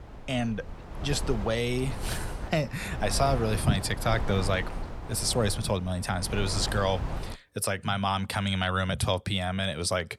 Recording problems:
wind noise on the microphone; occasional gusts; until 7.5 s; 10 dB below the speech

